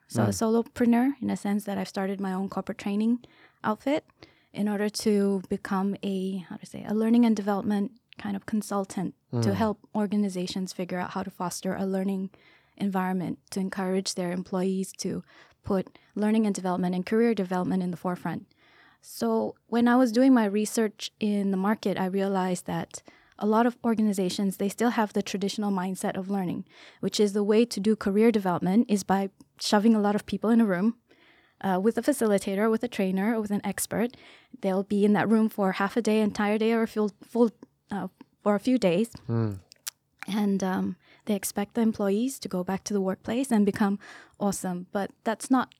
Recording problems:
none

